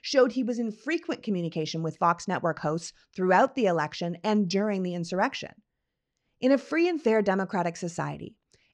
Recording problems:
muffled; slightly; fading above 4 kHz

